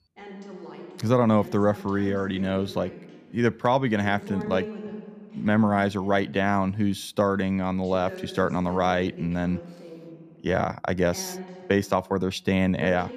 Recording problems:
voice in the background; noticeable; throughout; 15 dB below the speech

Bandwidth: 14.5 kHz